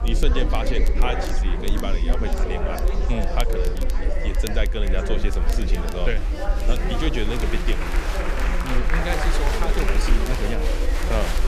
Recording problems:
chatter from many people; very loud; throughout; as loud as the speech
rain or running water; noticeable; throughout; 15 dB below the speech
low rumble; noticeable; throughout; 20 dB below the speech
crackle, like an old record; noticeable; 15 dB below the speech

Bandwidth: 14.5 kHz